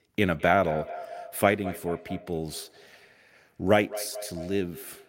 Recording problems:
echo of what is said; noticeable; throughout; 210 ms later, 15 dB below the speech

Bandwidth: 16 kHz